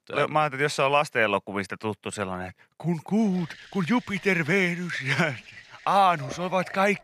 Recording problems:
household noises; faint; from 3.5 s on; 20 dB below the speech

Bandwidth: 14 kHz